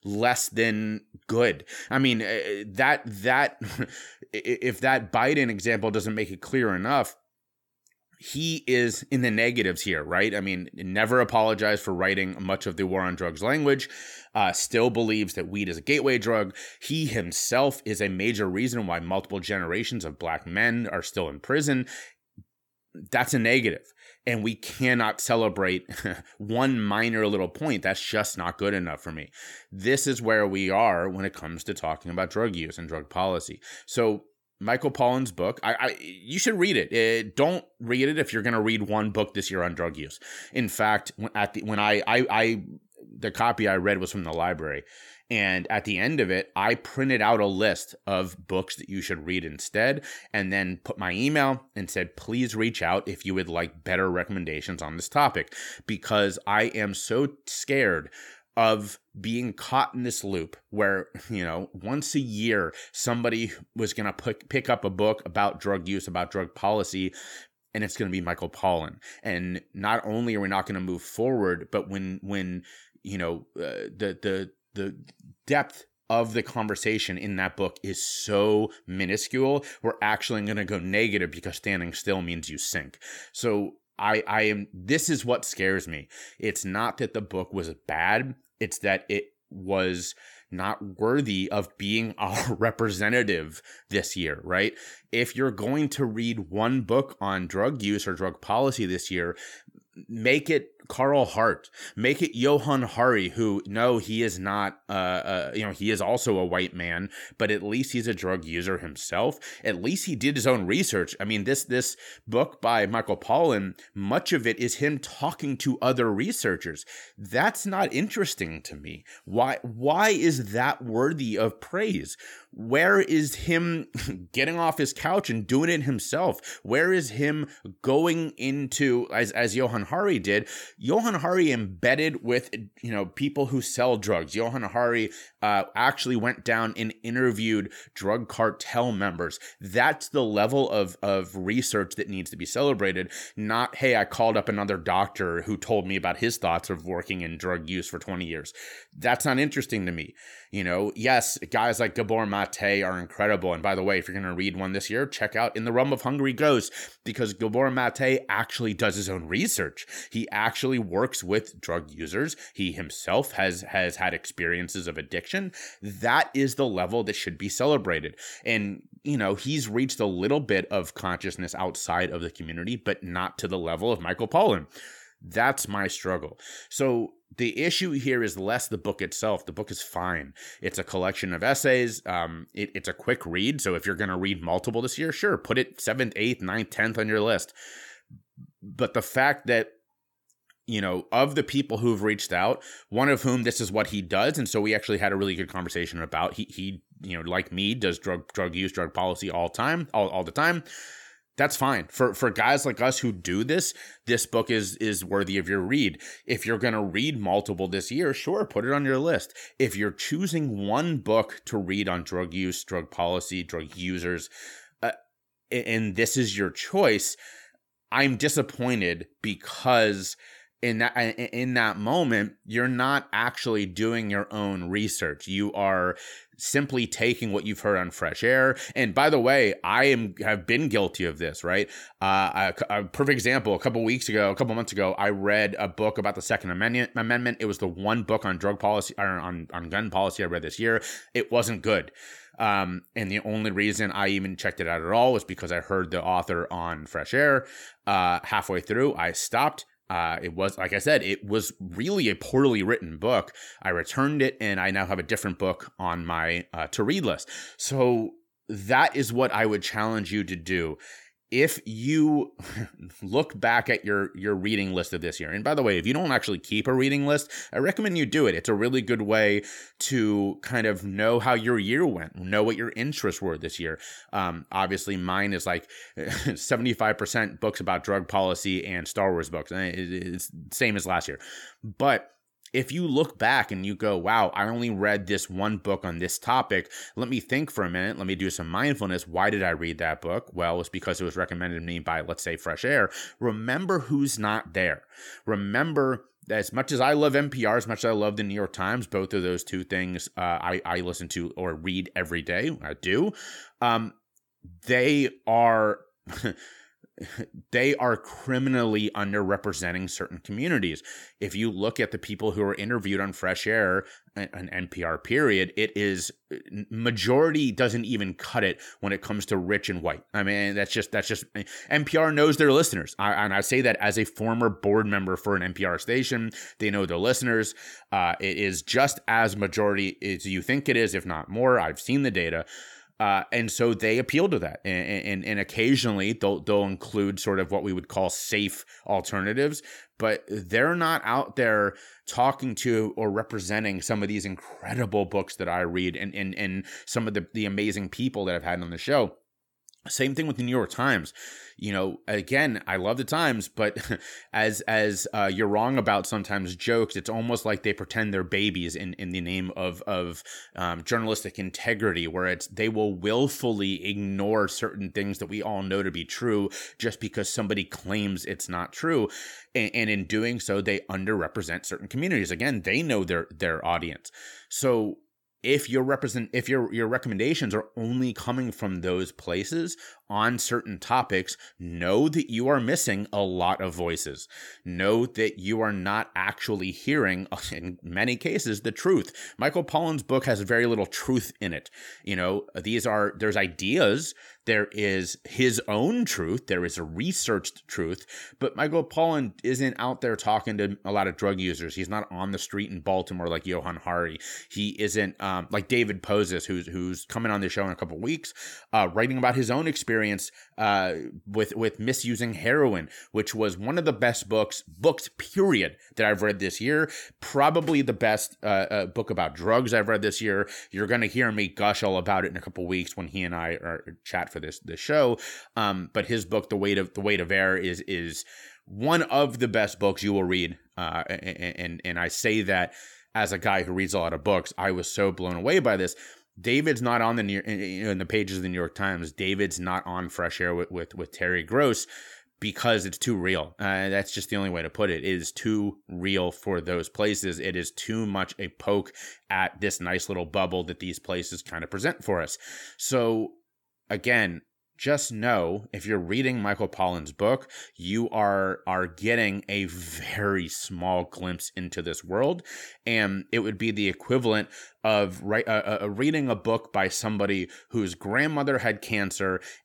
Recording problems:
none

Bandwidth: 18 kHz